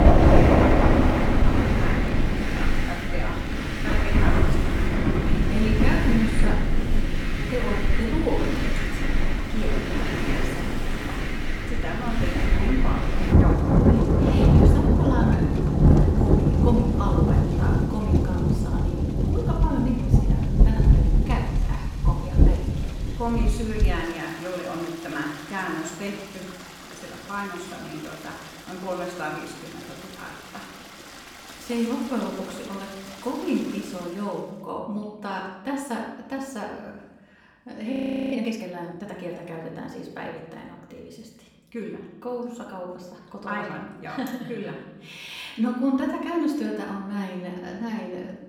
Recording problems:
off-mic speech; far
room echo; noticeable; dies away in 0.9 s
rain or running water; very loud; until 34 s; 9 dB above the speech
audio freezing; at 38 s

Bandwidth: 18.5 kHz